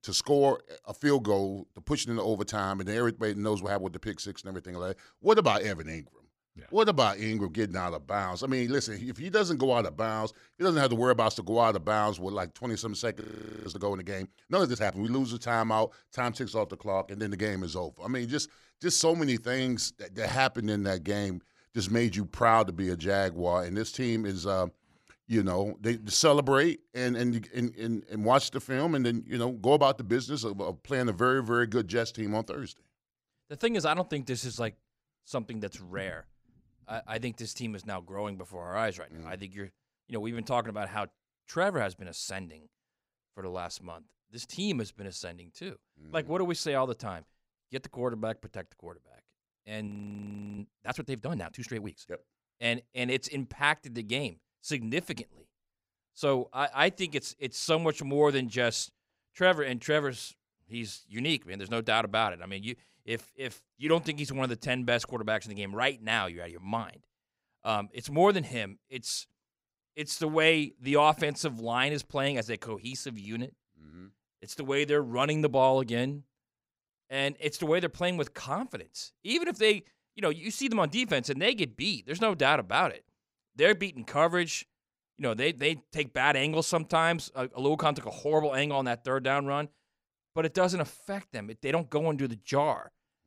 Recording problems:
audio freezing; at 13 s and at 50 s for 0.5 s

